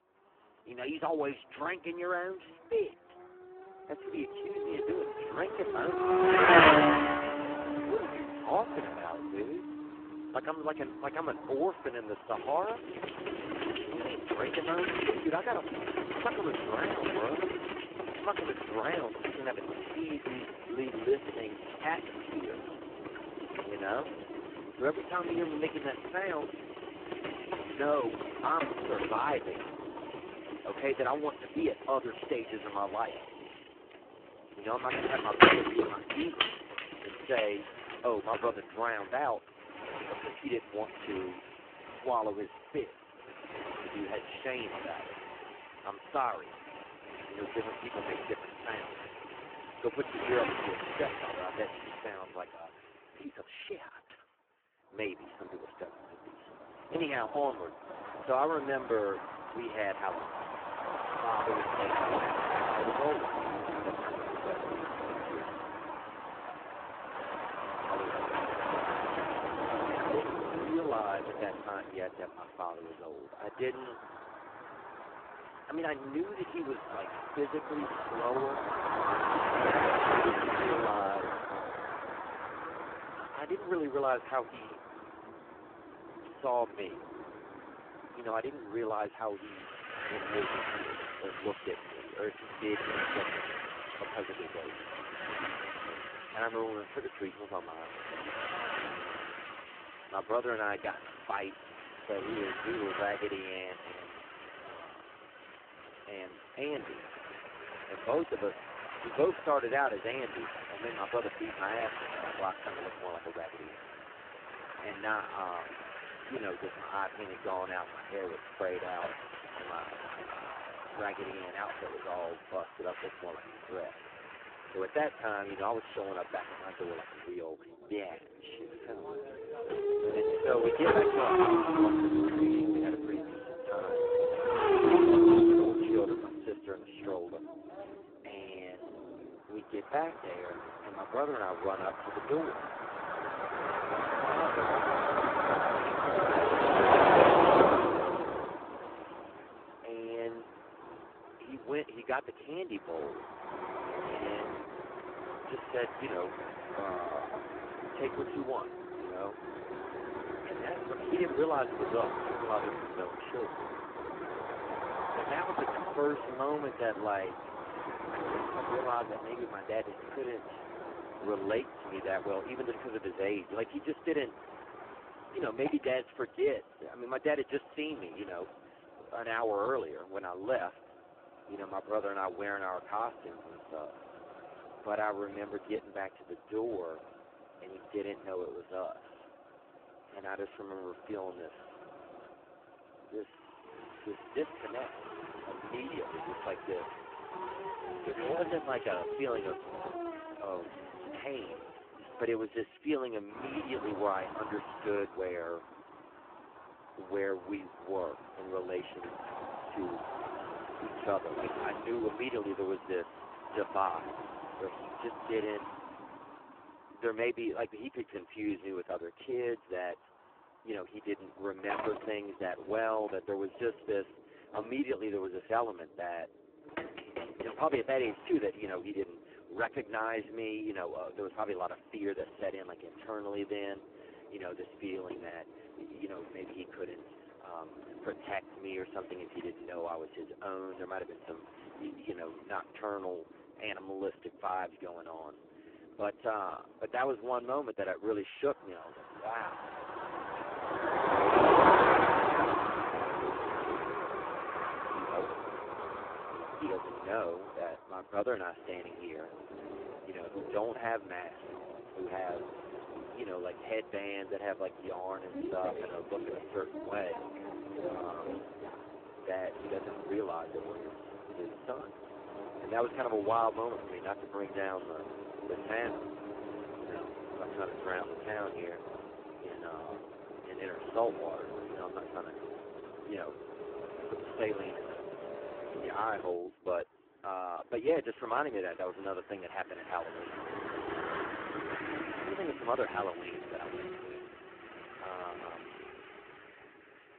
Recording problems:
phone-call audio; poor line
traffic noise; very loud; throughout; 3 dB above the speech

